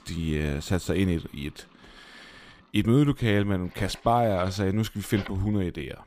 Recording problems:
household noises; faint; throughout; 25 dB below the speech

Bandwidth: 15 kHz